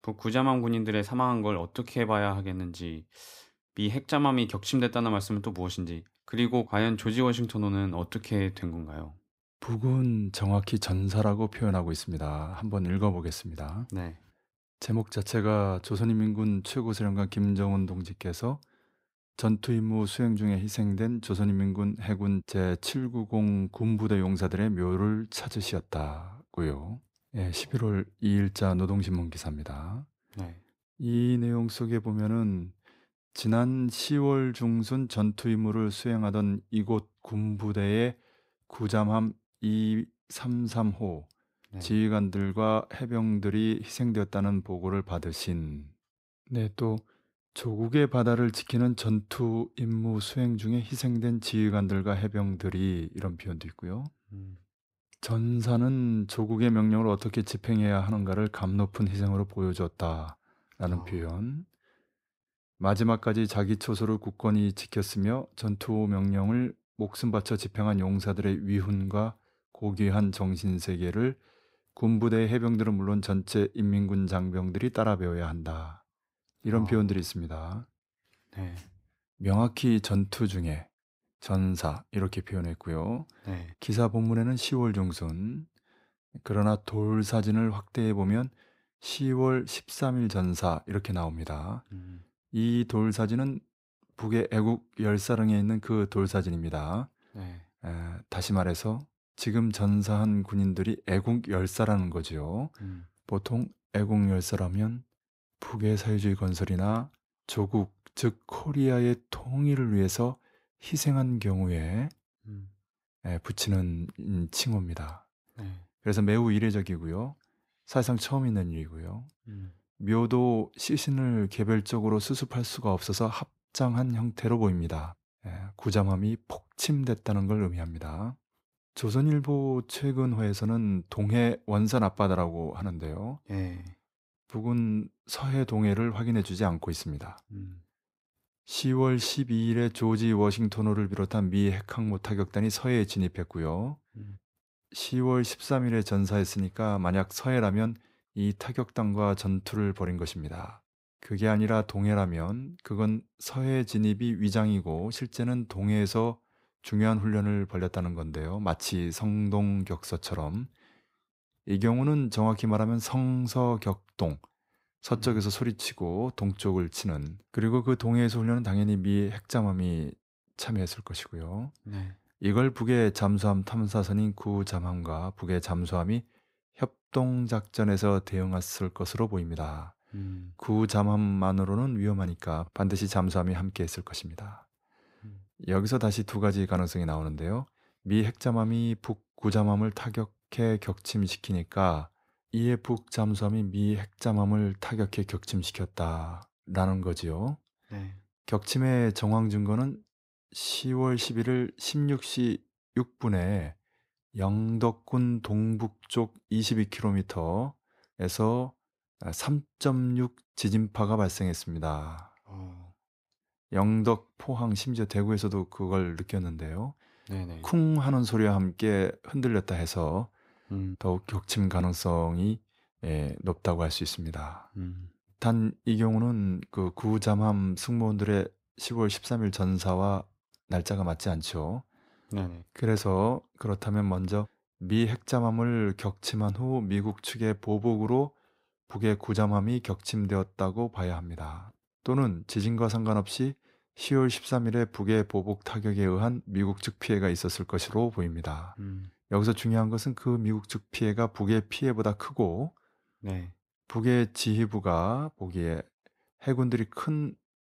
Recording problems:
none

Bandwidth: 15.5 kHz